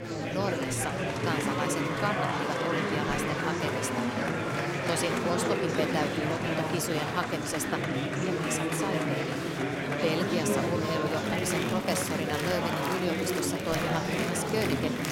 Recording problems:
murmuring crowd; very loud; throughout; 3 dB above the speech

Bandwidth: 16 kHz